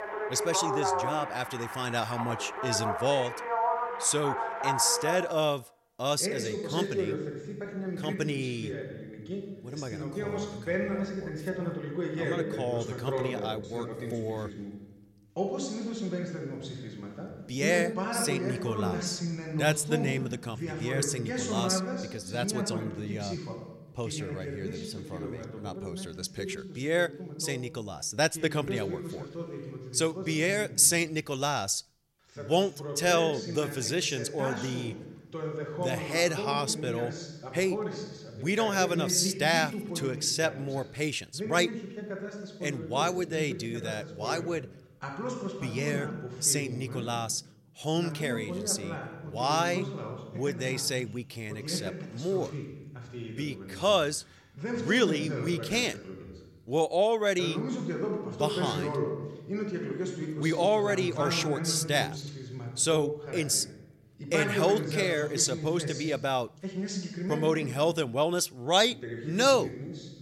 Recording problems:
voice in the background; loud; throughout; 6 dB below the speech

